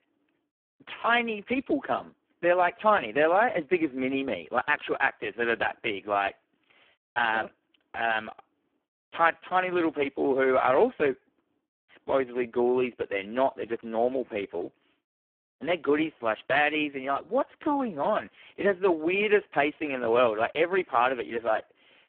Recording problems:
phone-call audio; poor line

